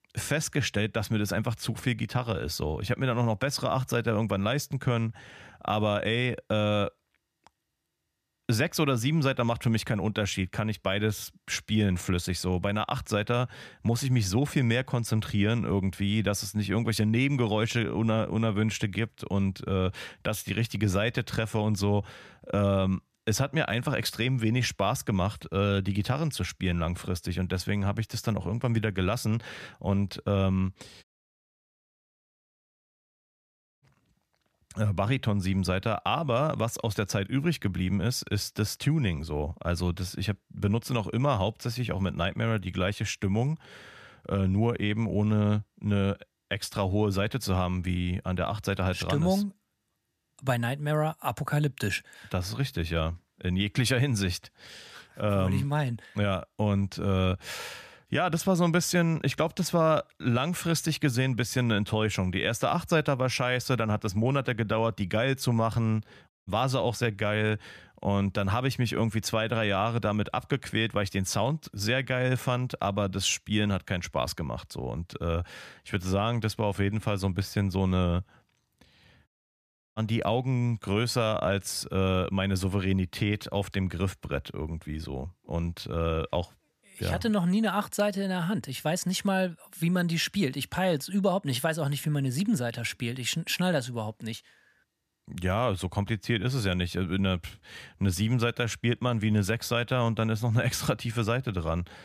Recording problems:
audio cutting out; at 31 s for 3 s, at 1:06 and at 1:19 for 0.5 s

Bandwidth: 14.5 kHz